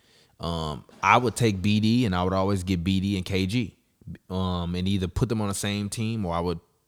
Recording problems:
none

